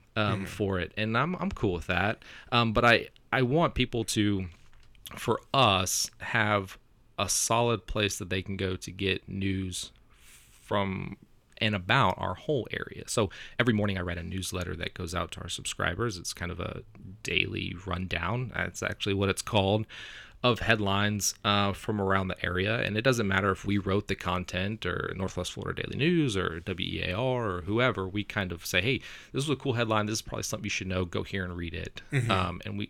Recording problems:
uneven, jittery; strongly; from 4 to 25 s

